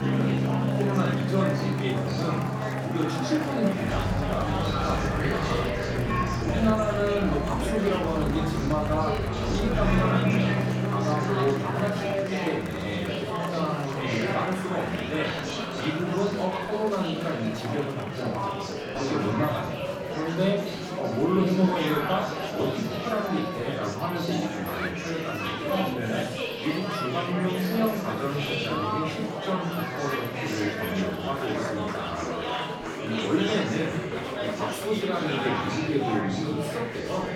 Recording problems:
off-mic speech; far
room echo; noticeable; dies away in 0.8 s
background music; loud; until 12 s; as loud as the speech
murmuring crowd; loud; throughout; 2 dB below the speech

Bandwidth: 17 kHz